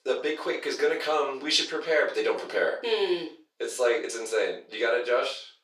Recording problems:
off-mic speech; far
thin; very; fading below 400 Hz
room echo; slight; dies away in 0.3 s

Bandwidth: 15 kHz